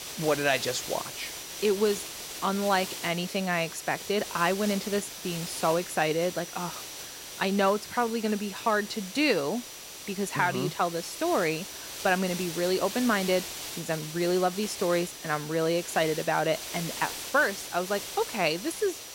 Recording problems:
hiss; loud; throughout; 9 dB below the speech
high-pitched whine; noticeable; throughout; 6 kHz, 20 dB below the speech

